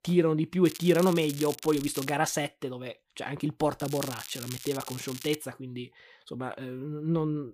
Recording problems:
crackling; noticeable; from 0.5 to 2 s and from 4 to 5.5 s; 10 dB below the speech

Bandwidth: 15 kHz